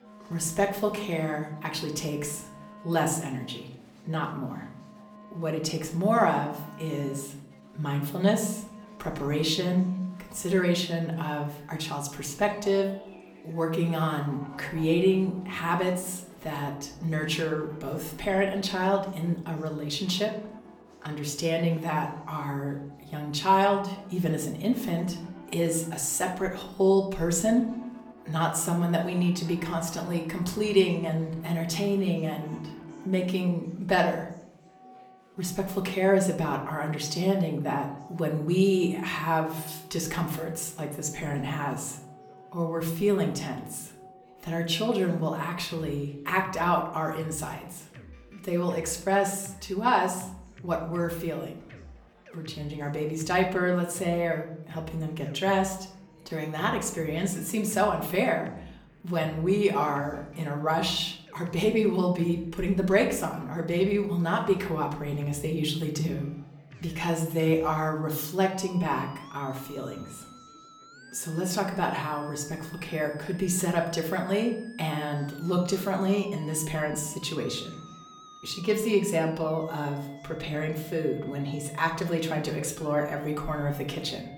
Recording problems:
off-mic speech; far
room echo; slight; dies away in 0.6 s
background music; faint; throughout; 20 dB below the speech
chatter from many people; faint; throughout; 30 dB below the speech

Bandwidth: 18.5 kHz